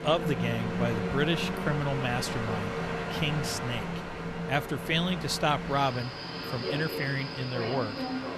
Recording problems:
train or aircraft noise; loud; throughout; 3 dB below the speech

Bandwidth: 14 kHz